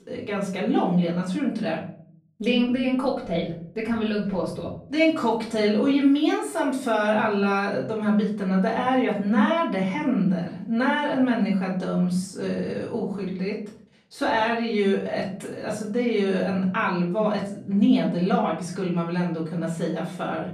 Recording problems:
off-mic speech; far
room echo; slight; dies away in 0.5 s

